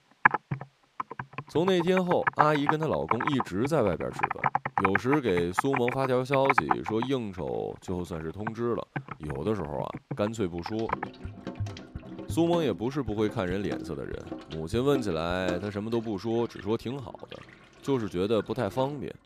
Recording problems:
household noises; loud; throughout; 3 dB below the speech

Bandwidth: 15 kHz